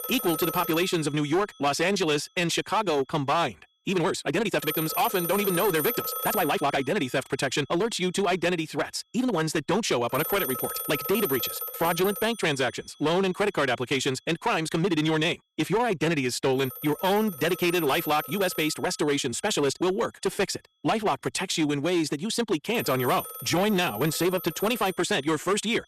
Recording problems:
wrong speed, natural pitch; too fast; 1.8 times normal speed
distortion; slight; 10% of the sound clipped
alarms or sirens; loud; throughout; 7 dB below the speech
uneven, jittery; strongly; from 1.5 to 25 s

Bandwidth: 13.5 kHz